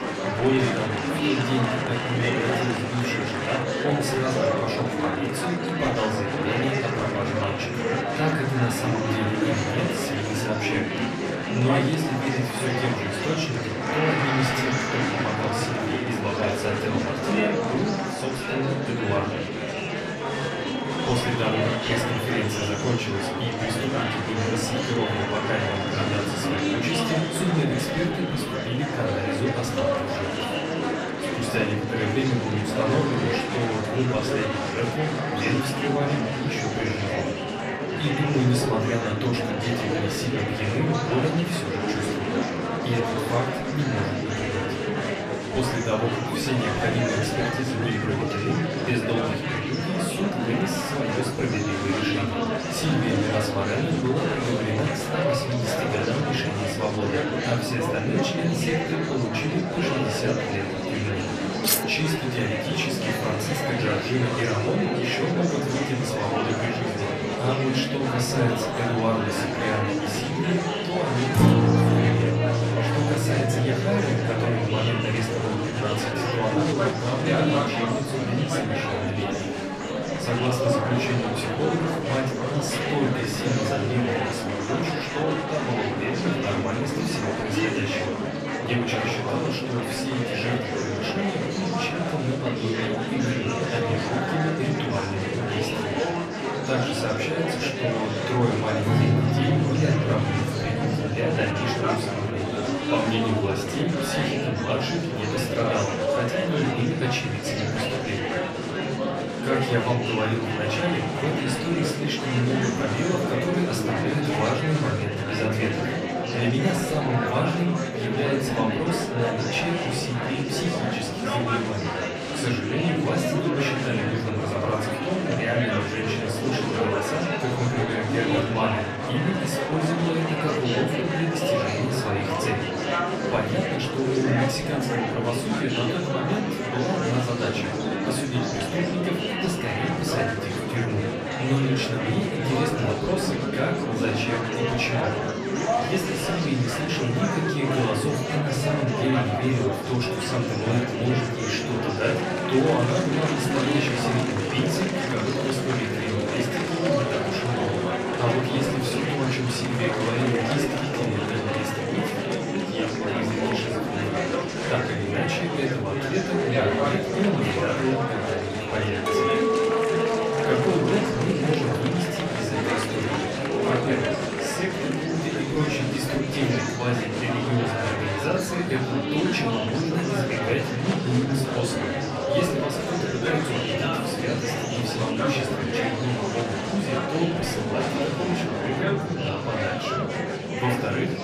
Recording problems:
off-mic speech; far
room echo; slight; dies away in 0.5 s
murmuring crowd; very loud; throughout; as loud as the speech
background music; loud; throughout; 7 dB below the speech
clattering dishes; loud; at 1:02 and from 2:49 to 2:53; peak 5 dB above the speech

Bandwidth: 14.5 kHz